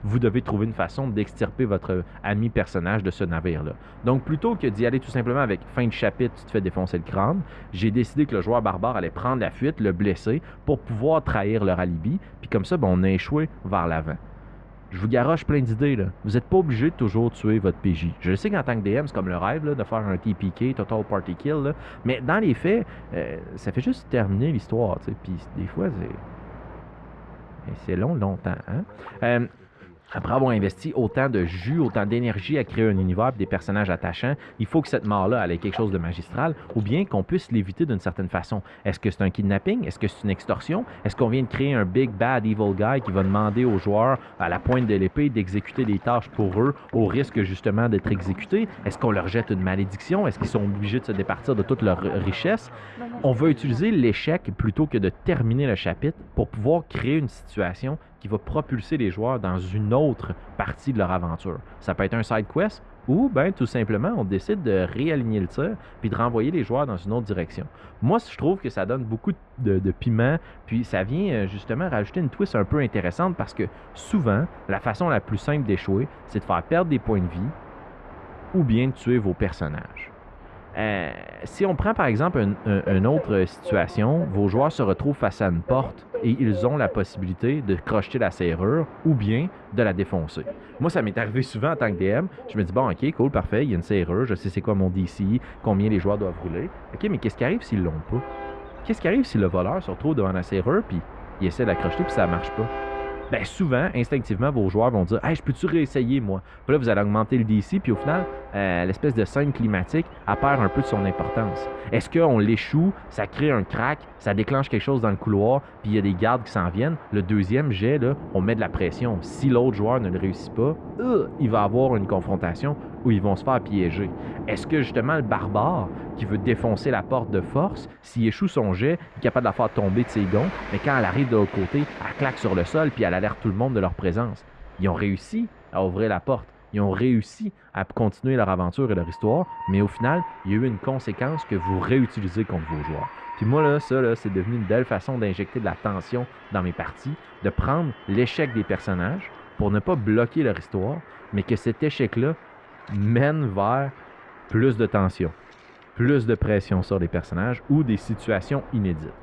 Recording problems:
muffled; very; fading above 2 kHz
train or aircraft noise; noticeable; throughout; 15 dB below the speech

